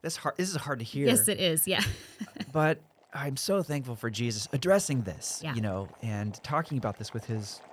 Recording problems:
household noises; faint; throughout; 25 dB below the speech

